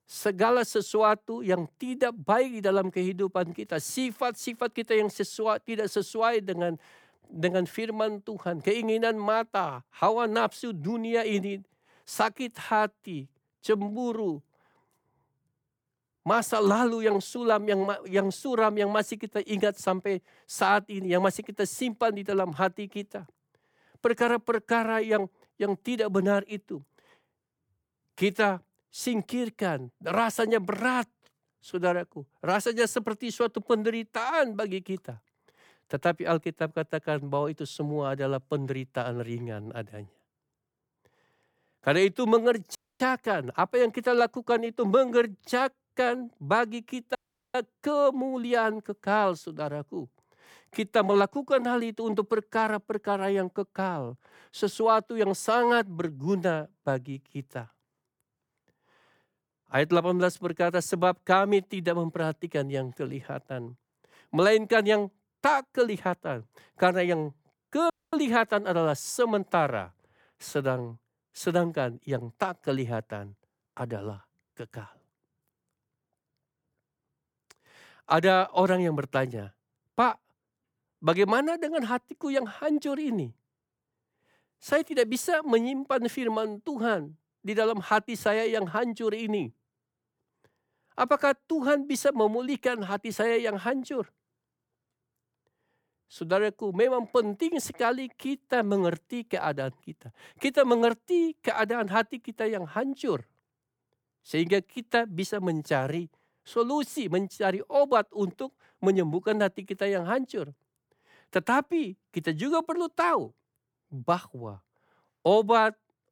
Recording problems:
audio cutting out; at 43 s, at 47 s and at 1:08

